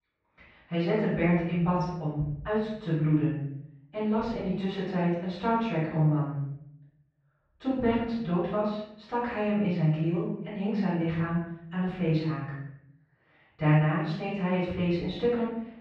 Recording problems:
off-mic speech; far
muffled; very; fading above 2.5 kHz
room echo; noticeable; dies away in 0.7 s

